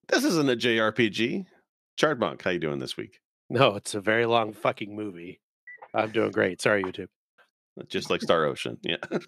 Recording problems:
none

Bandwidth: 14 kHz